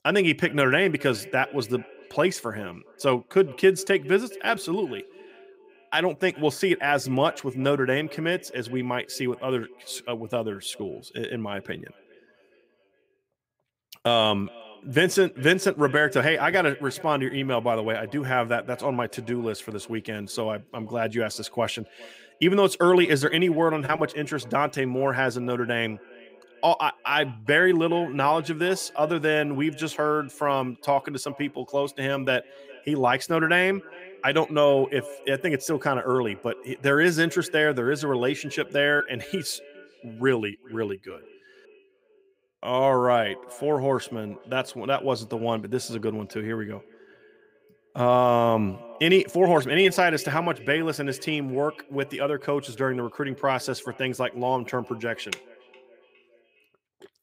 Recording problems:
echo of what is said; faint; throughout; 410 ms later, 20 dB below the speech

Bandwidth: 15.5 kHz